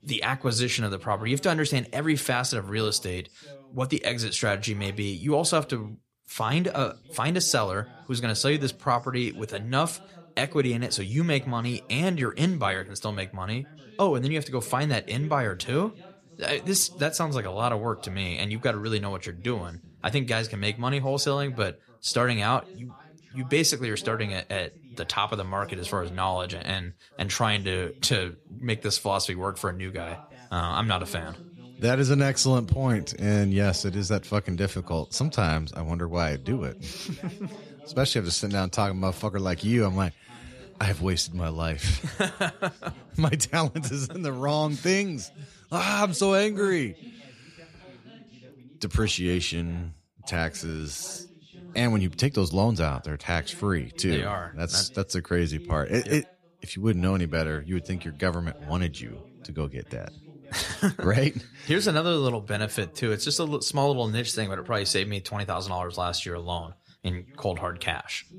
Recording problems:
background chatter; faint; throughout; 2 voices, 25 dB below the speech

